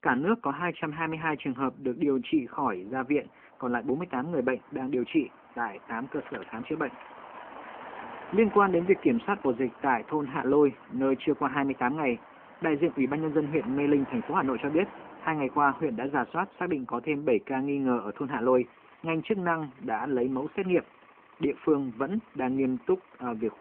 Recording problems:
phone-call audio
traffic noise; noticeable; throughout; 20 dB below the speech

